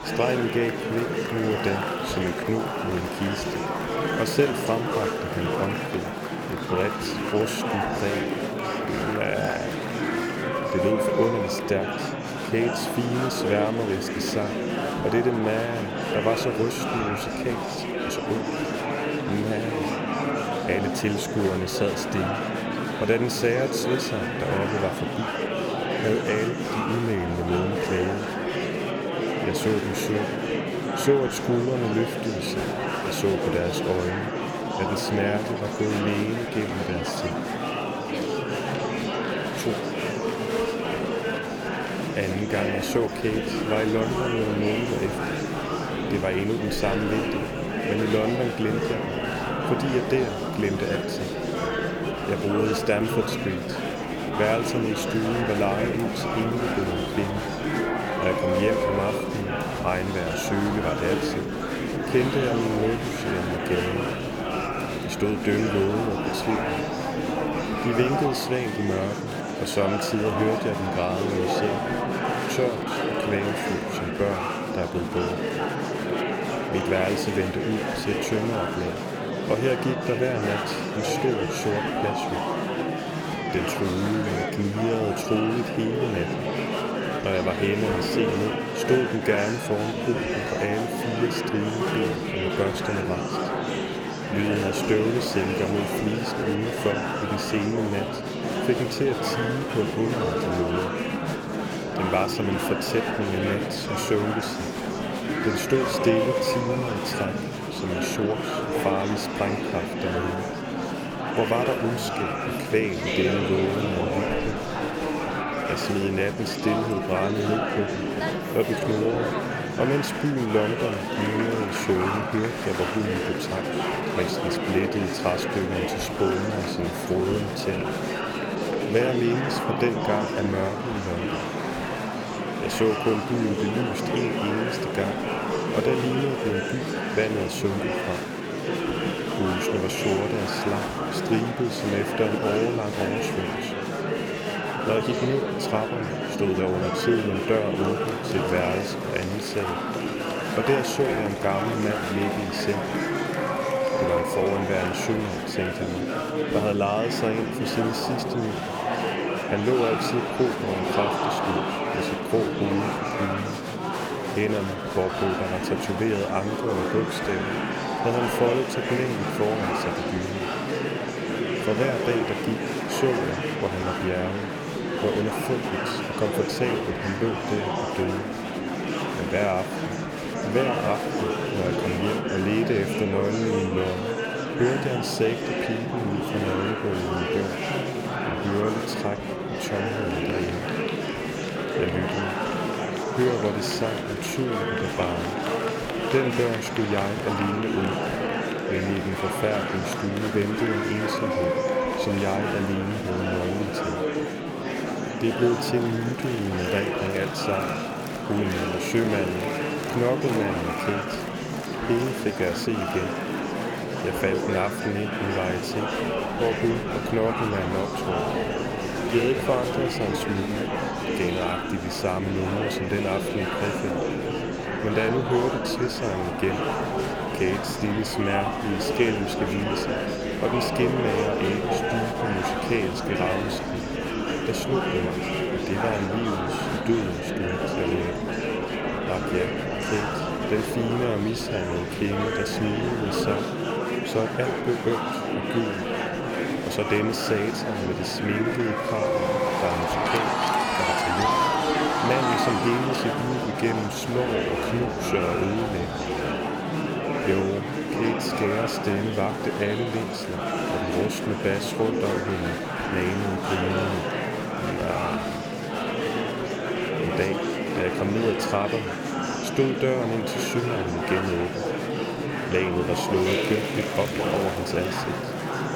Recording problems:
murmuring crowd; very loud; throughout; as loud as the speech

